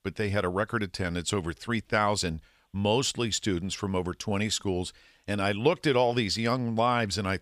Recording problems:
none

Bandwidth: 15 kHz